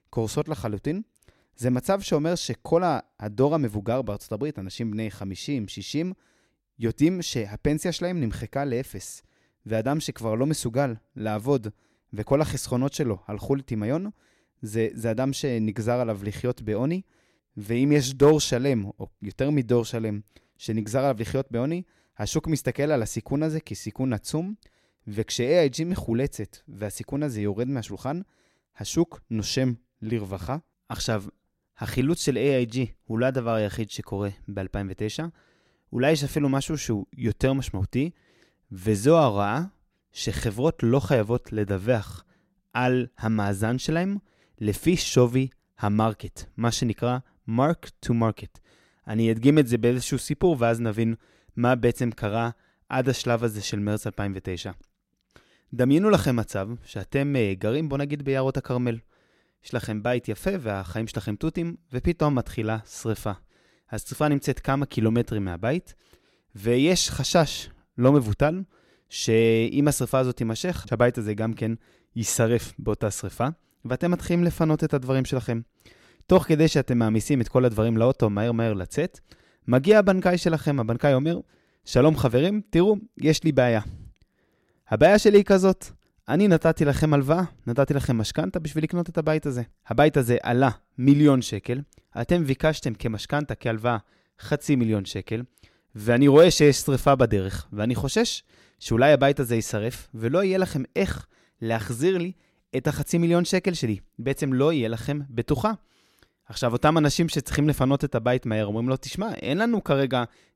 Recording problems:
none

